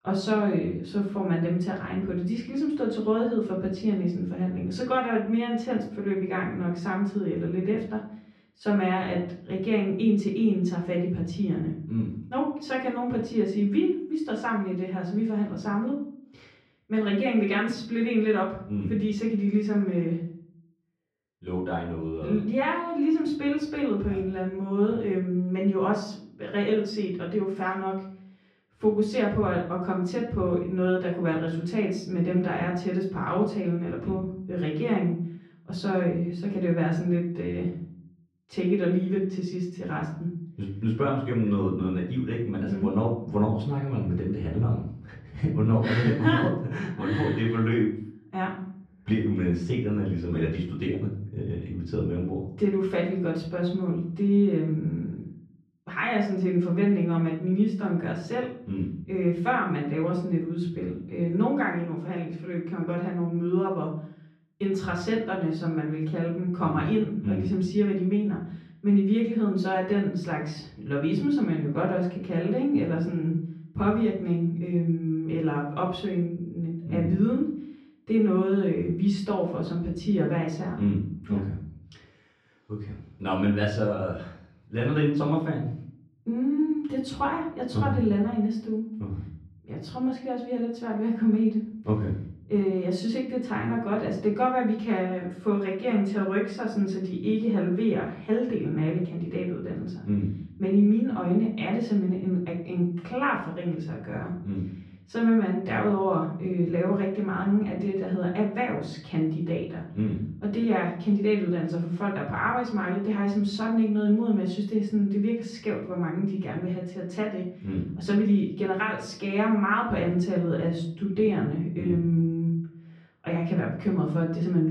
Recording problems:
off-mic speech; far
muffled; slightly; fading above 3 kHz
room echo; slight; dies away in 0.5 s
abrupt cut into speech; at the end

